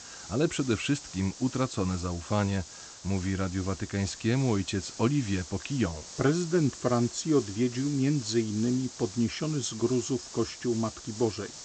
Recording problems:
high frequencies cut off; noticeable; nothing above 8 kHz
hiss; noticeable; throughout; 15 dB below the speech

